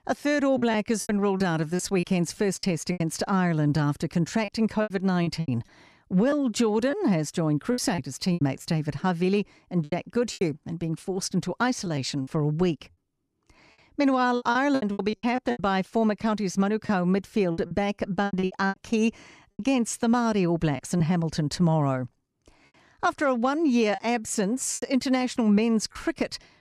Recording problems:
choppy; very; 10% of the speech affected

